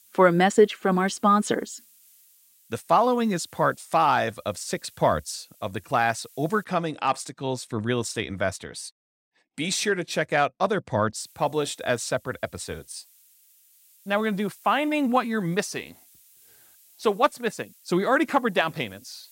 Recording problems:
hiss; faint; until 6.5 s and from 11 s on; 30 dB below the speech

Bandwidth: 16 kHz